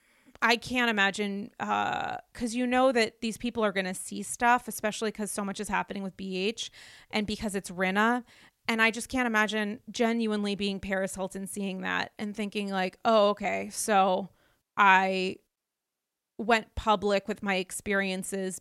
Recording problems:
none

